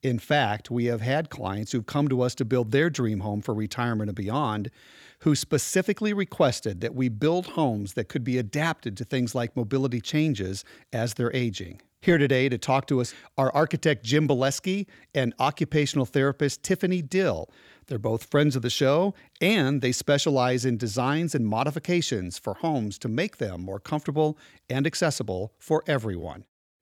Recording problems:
none

